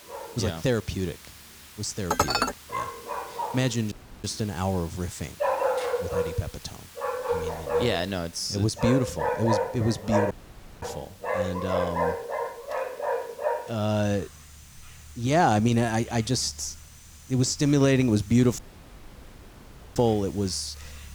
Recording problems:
animal sounds; loud; throughout; 3 dB below the speech
hiss; faint; throughout; 20 dB below the speech
clattering dishes; loud; at 2 s; peak 3 dB above the speech
audio cutting out; at 4 s, at 10 s for 0.5 s and at 19 s for 1.5 s

